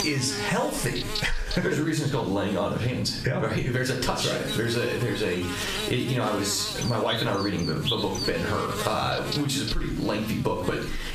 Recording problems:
off-mic speech; far
room echo; slight; dies away in 0.4 s
squashed, flat; somewhat
electrical hum; loud; throughout; 50 Hz, 5 dB below the speech

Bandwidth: 14.5 kHz